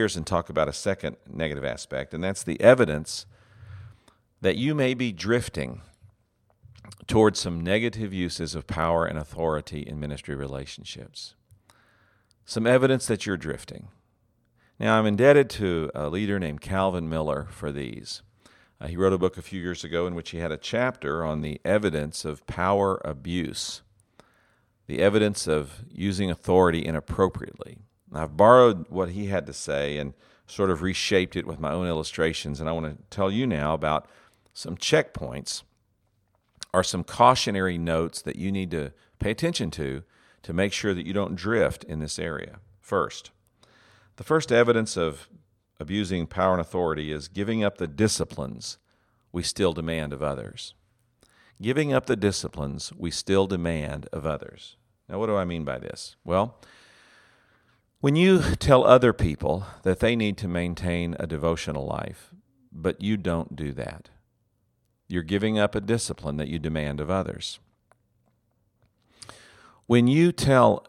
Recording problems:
abrupt cut into speech; at the start

